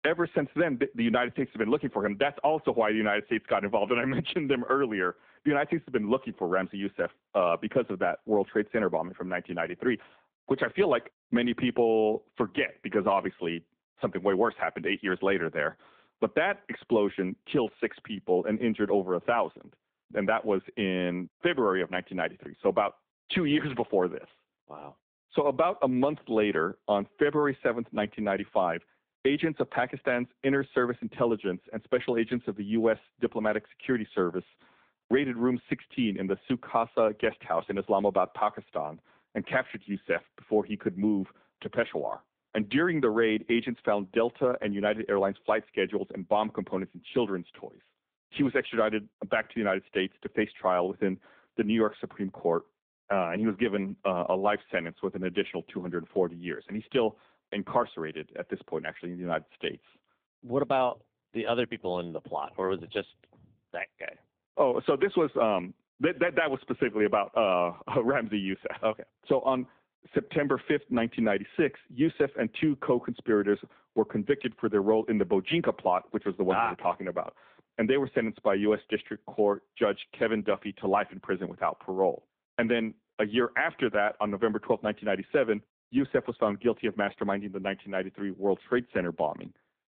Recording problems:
phone-call audio

